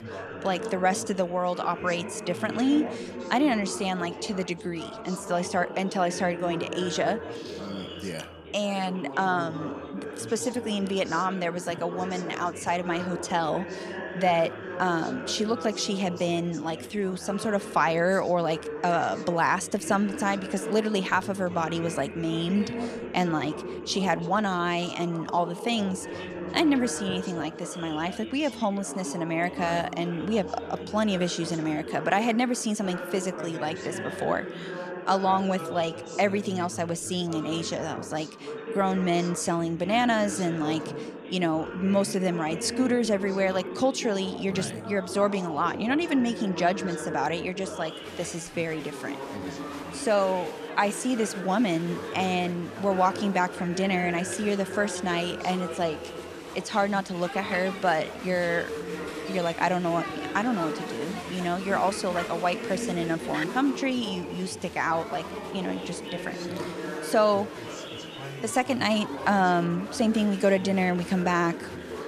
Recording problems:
chatter from many people; loud; throughout; 9 dB below the speech

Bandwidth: 14.5 kHz